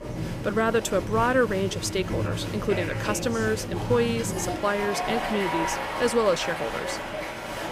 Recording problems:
crowd noise; loud; throughout; 4 dB below the speech

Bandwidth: 15 kHz